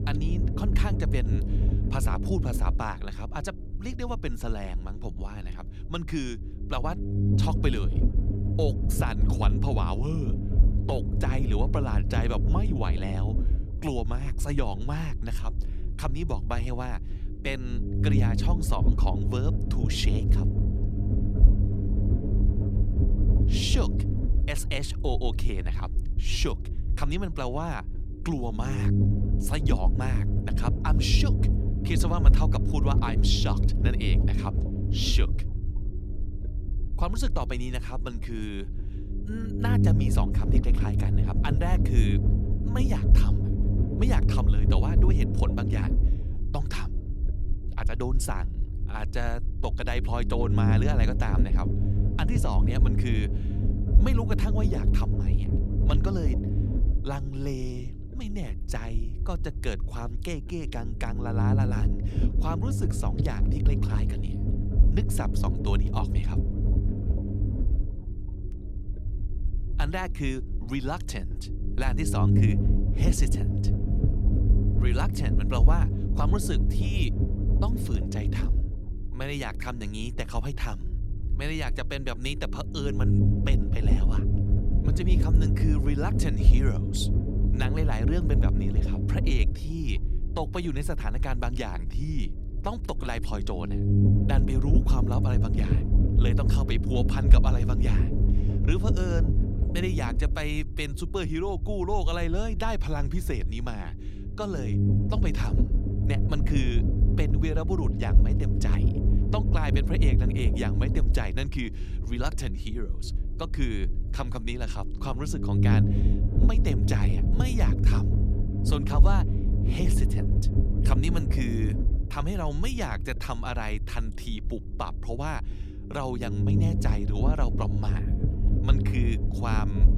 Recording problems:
low rumble; loud; throughout; 3 dB below the speech

